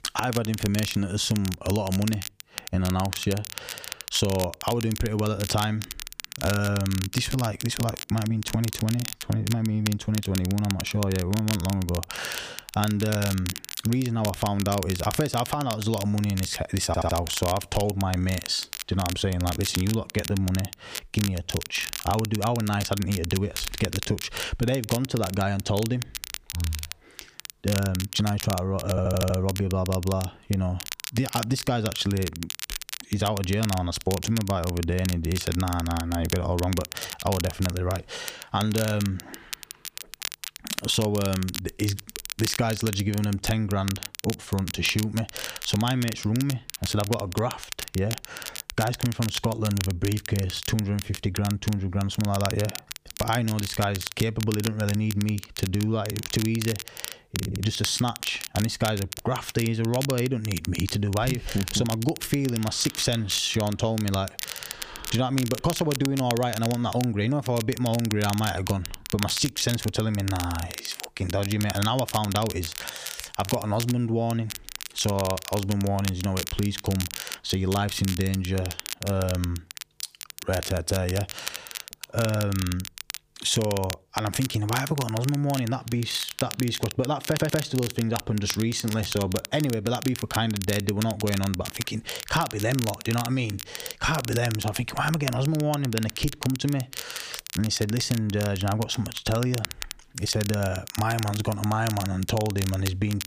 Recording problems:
squashed, flat; somewhat
crackle, like an old record; loud; 8 dB below the speech
audio stuttering; 4 times, first at 17 s

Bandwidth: 15 kHz